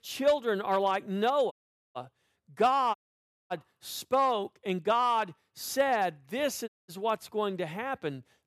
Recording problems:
audio cutting out; at 1.5 s, at 3 s for 0.5 s and at 6.5 s

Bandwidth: 13.5 kHz